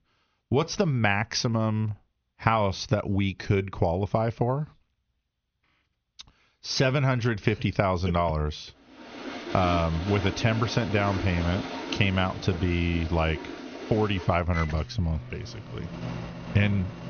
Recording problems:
high frequencies cut off; noticeable; nothing above 6.5 kHz
household noises; noticeable; from 9 s on; 10 dB below the speech

